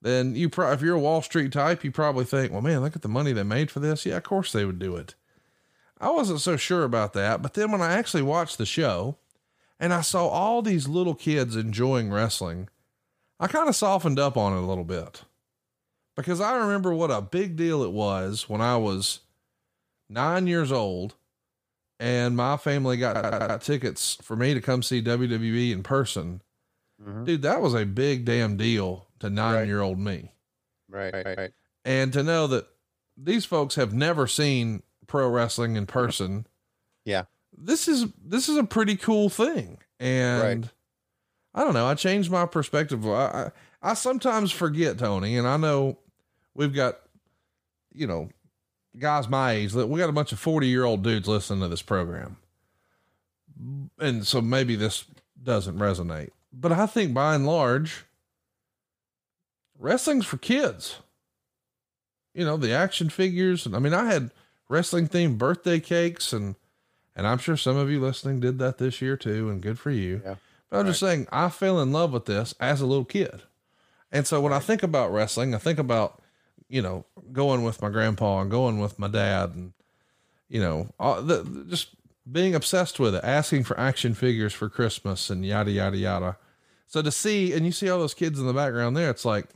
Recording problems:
audio stuttering; at 23 s and at 31 s

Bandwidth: 15 kHz